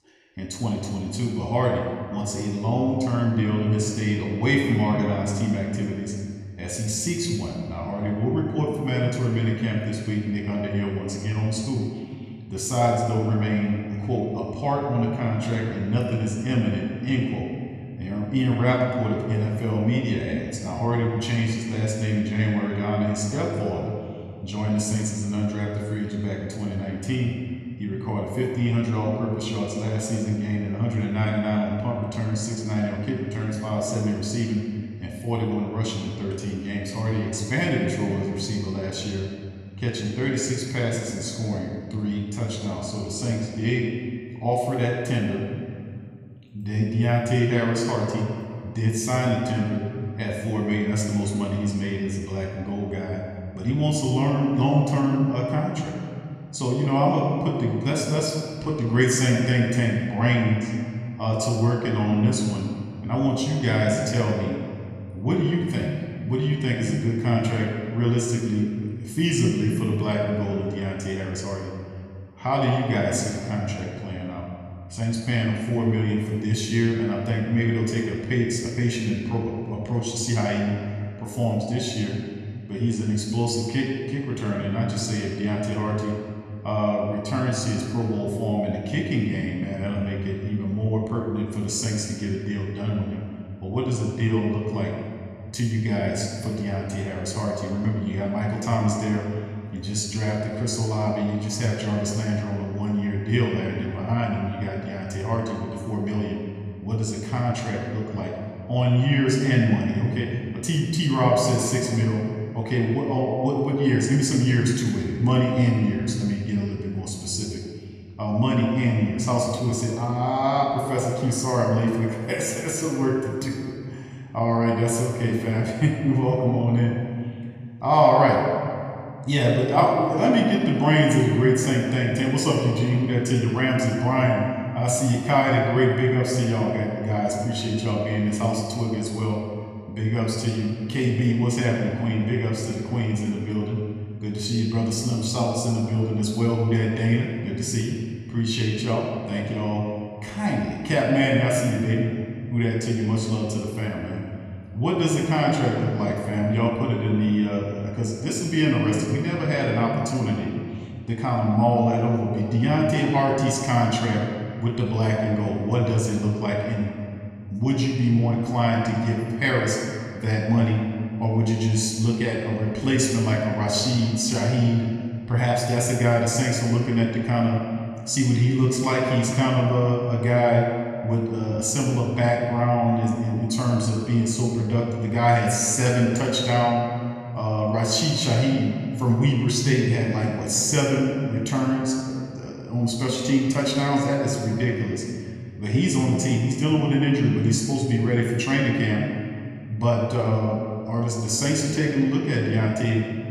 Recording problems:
room echo; noticeable; dies away in 2 s
off-mic speech; somewhat distant

